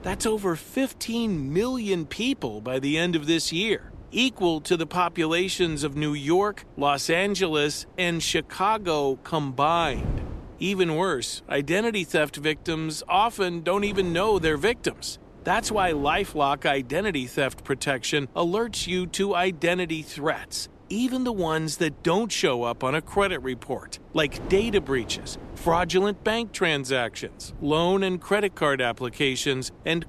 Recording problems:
wind noise on the microphone; occasional gusts; 25 dB below the speech

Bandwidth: 13.5 kHz